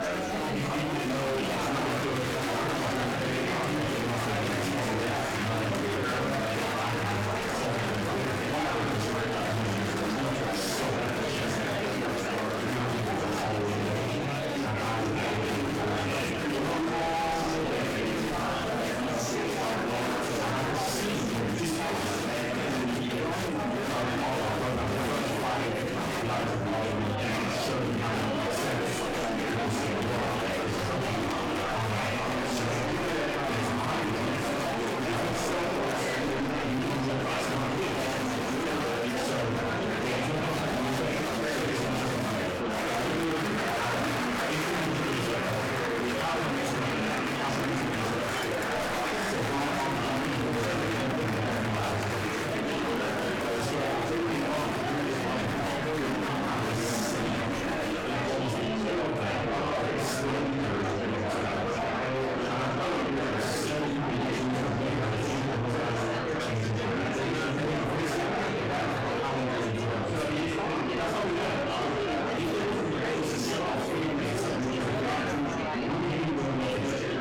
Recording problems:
distortion; heavy; 7 dB below the speech
off-mic speech; far
room echo; noticeable; dies away in 0.6 s
murmuring crowd; very loud; throughout; 2 dB above the speech
background music; very faint; throughout; 25 dB below the speech
clattering dishes; faint; at 23 s and at 48 s; peak 10 dB below the speech

